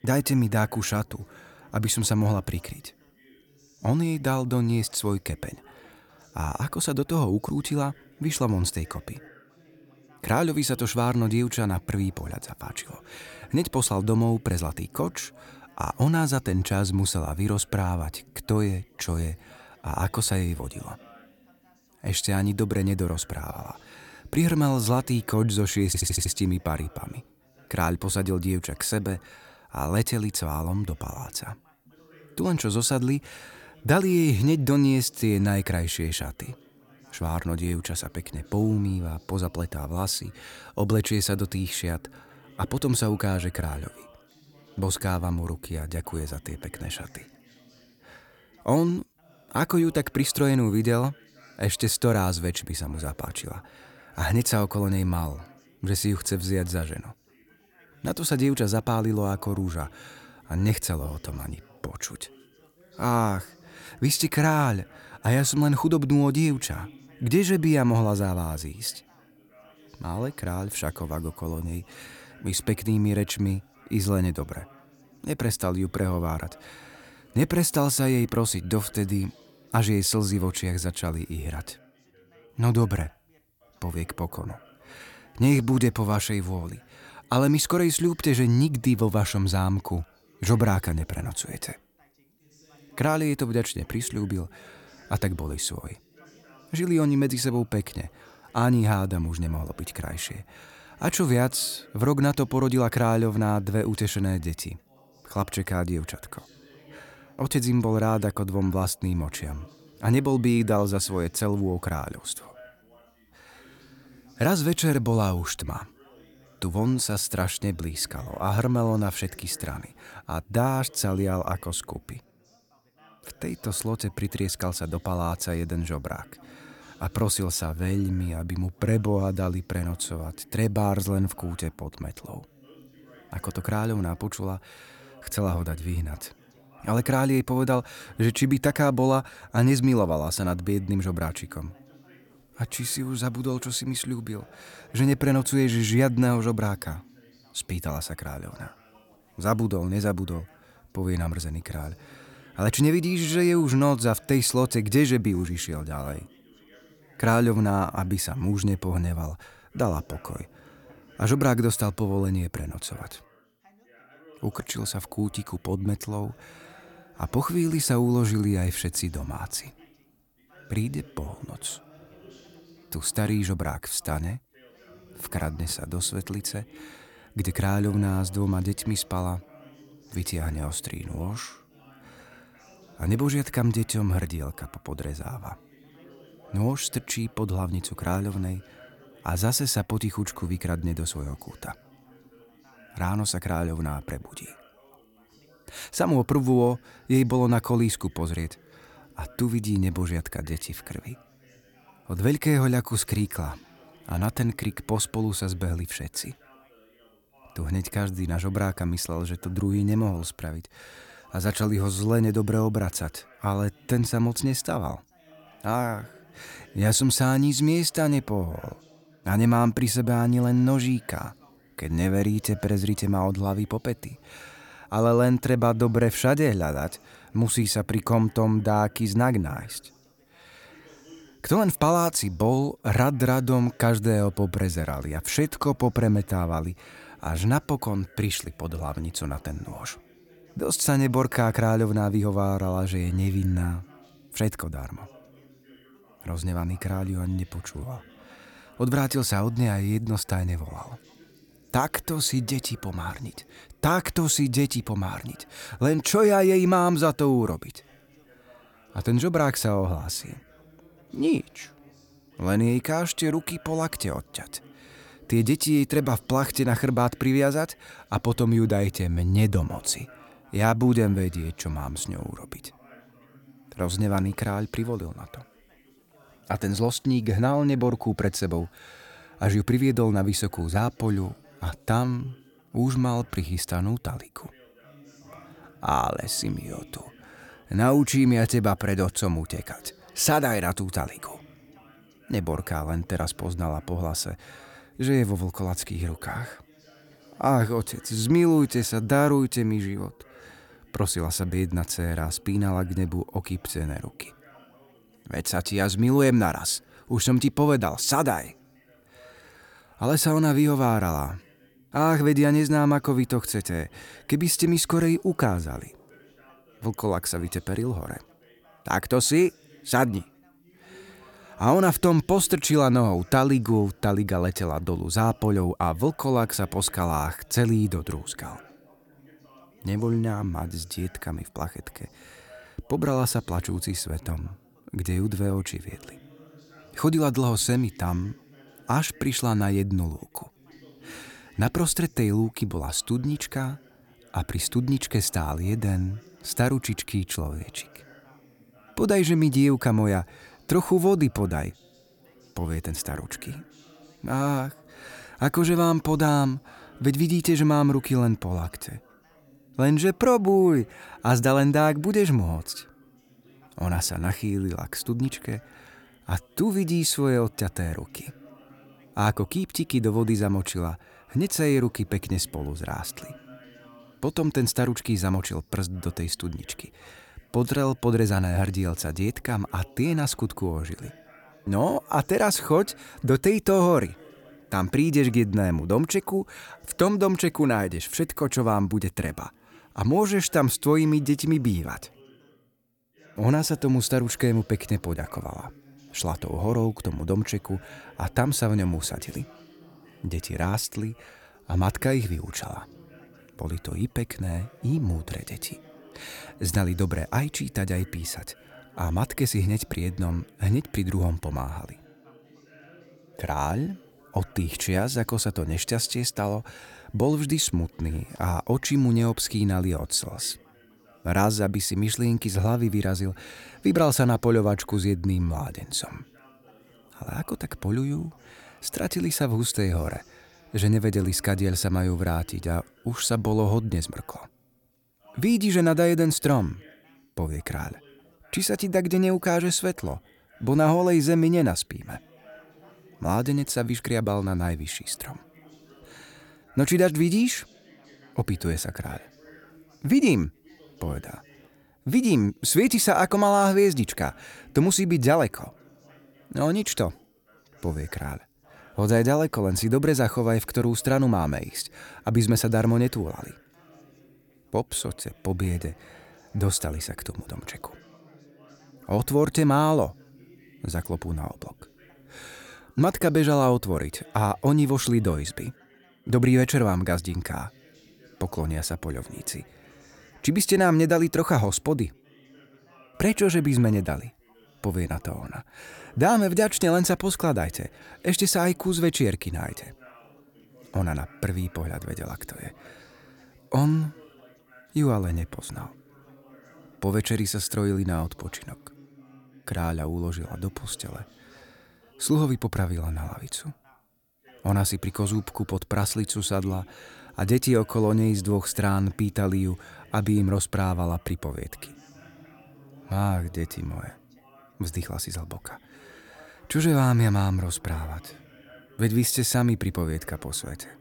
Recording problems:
background chatter; faint; throughout; 3 voices, 30 dB below the speech
audio stuttering; at 26 s

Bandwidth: 18 kHz